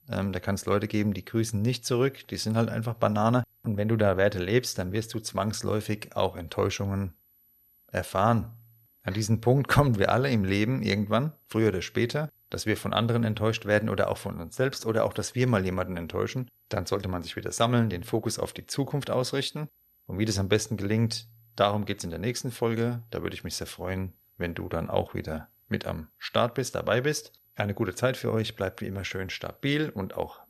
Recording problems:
high-pitched whine; faint; throughout; 12 kHz, 35 dB below the speech

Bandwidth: 13.5 kHz